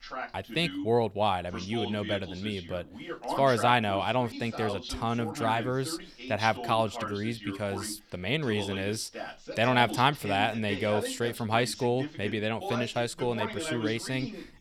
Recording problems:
voice in the background; loud; throughout; 9 dB below the speech

